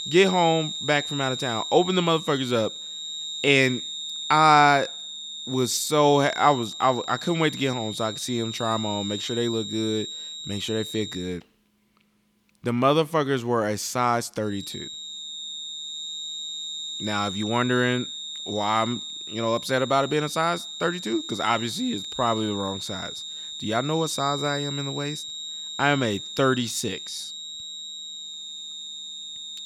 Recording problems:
high-pitched whine; loud; until 11 s and from 15 s on; 3.5 kHz, 8 dB below the speech

